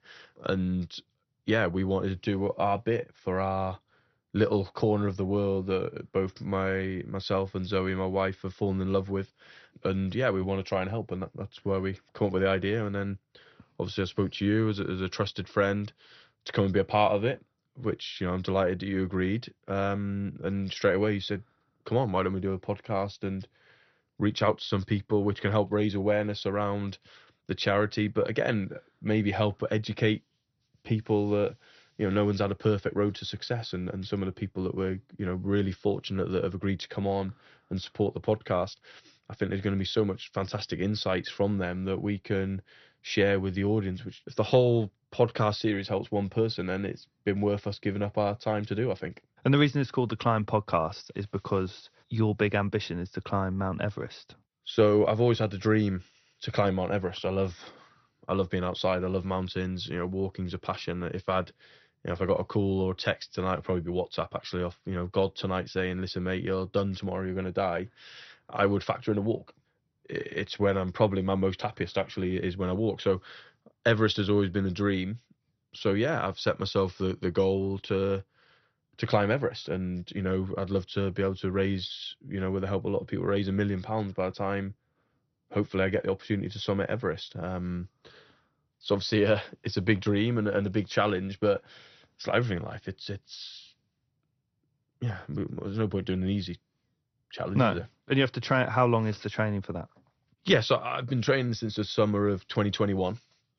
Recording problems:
garbled, watery; slightly; nothing above 6 kHz

